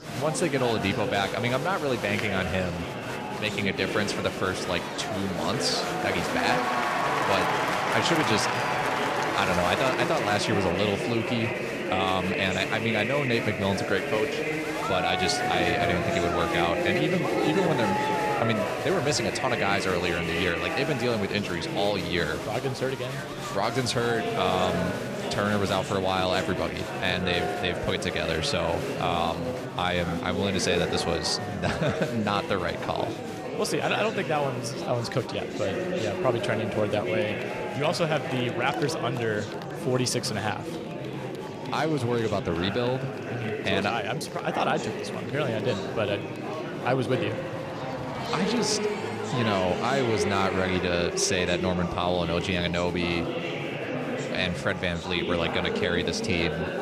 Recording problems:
murmuring crowd; loud; throughout; 2 dB below the speech

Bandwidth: 14.5 kHz